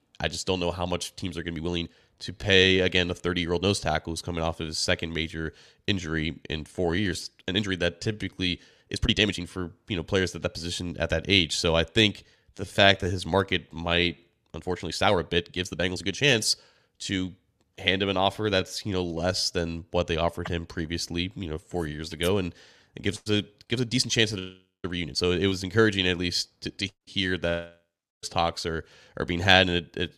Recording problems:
uneven, jittery; strongly; from 1 to 25 s

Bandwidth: 14 kHz